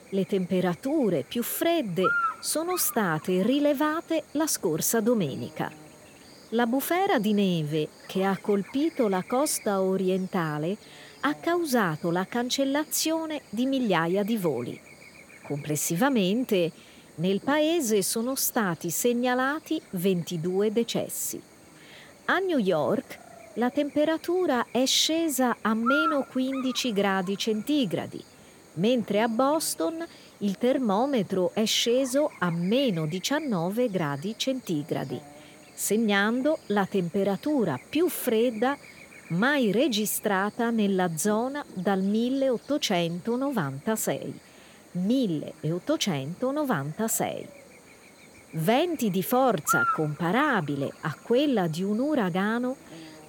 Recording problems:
electrical hum; loud; throughout; 60 Hz, 7 dB below the speech

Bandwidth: 17.5 kHz